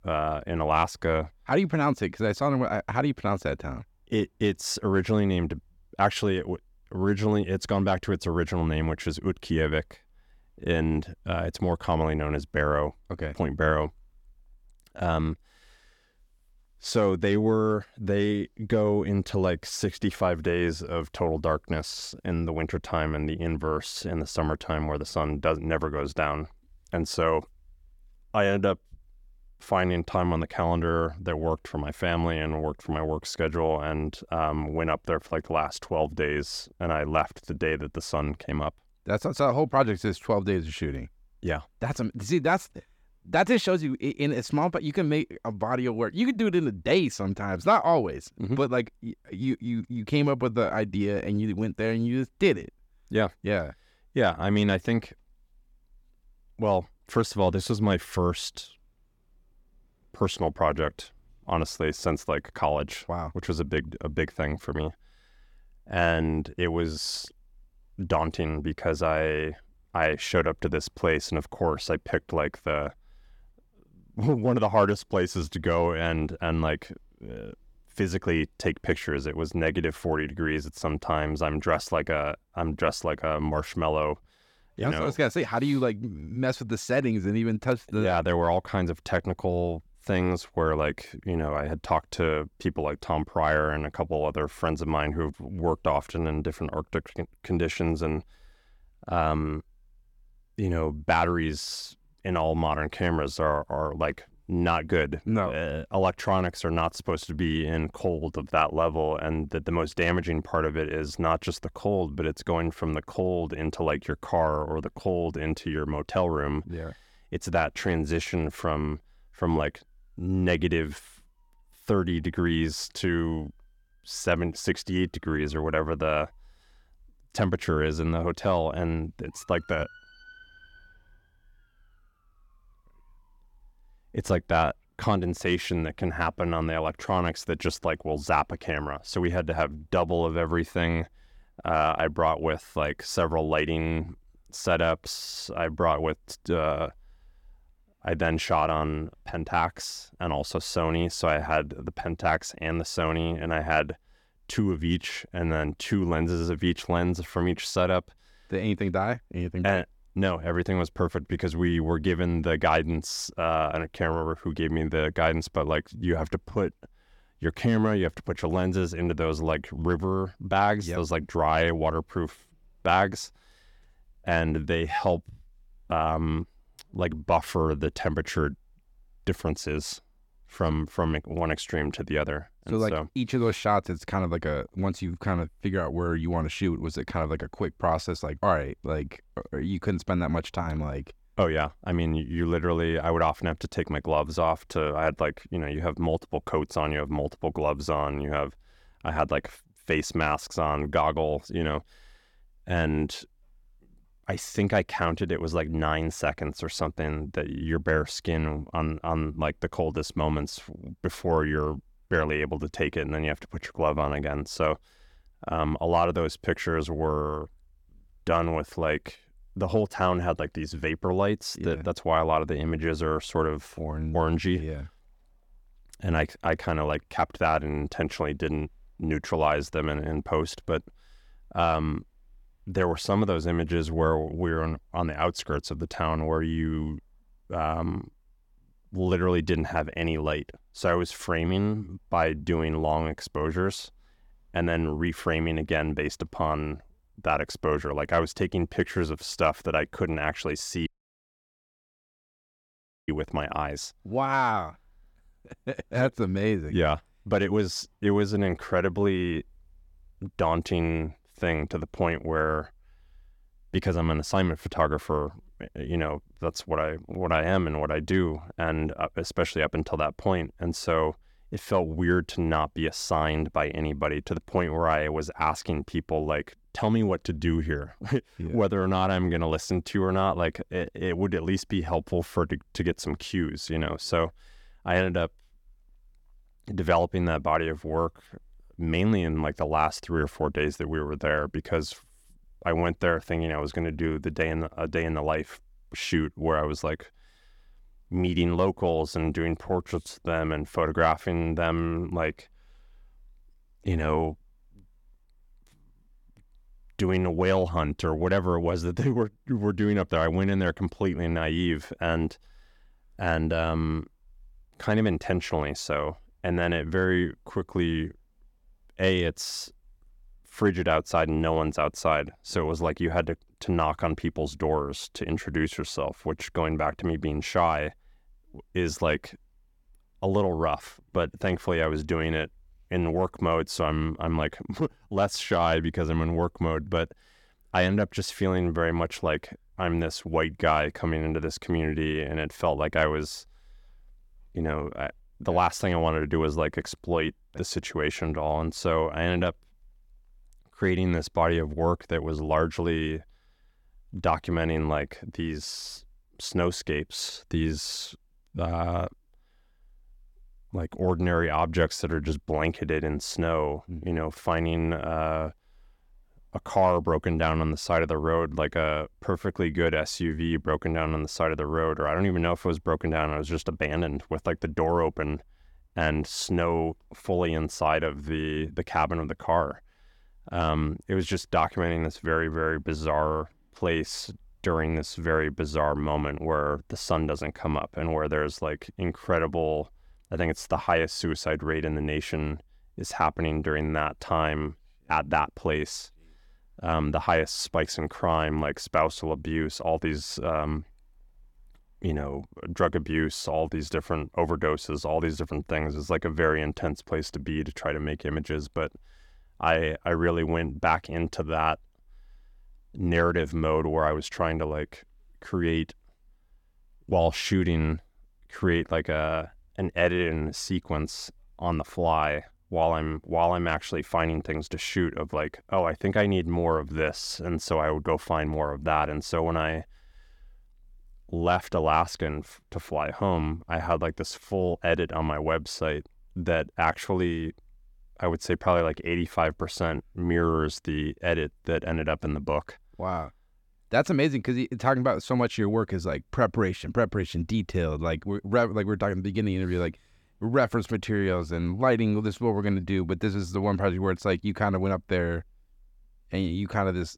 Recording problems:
audio cutting out; at 4:11 for 2 s

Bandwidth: 17 kHz